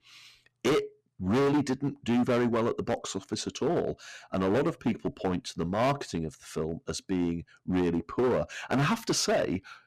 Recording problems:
distortion; heavy; 11% of the sound clipped

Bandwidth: 14.5 kHz